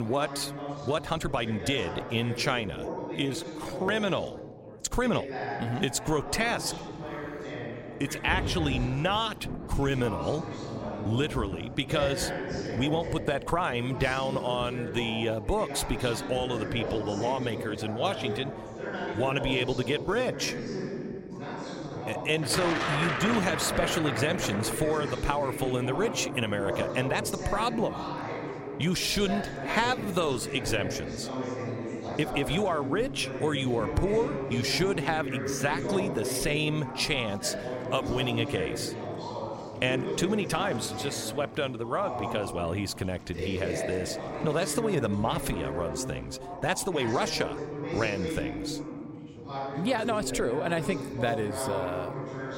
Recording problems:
rain or running water; loud; throughout; 10 dB below the speech
background chatter; loud; throughout; 4 voices, 6 dB below the speech
abrupt cut into speech; at the start
uneven, jittery; strongly; from 0.5 to 50 s

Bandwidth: 16 kHz